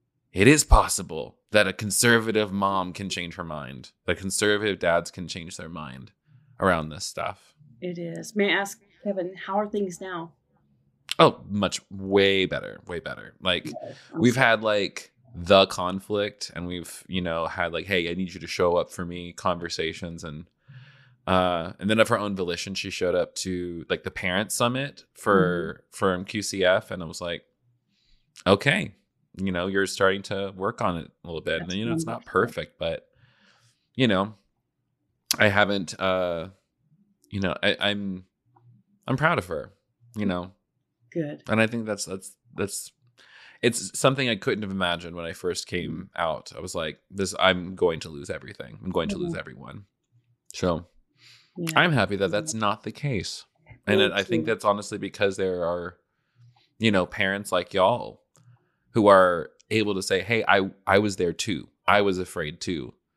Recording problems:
none

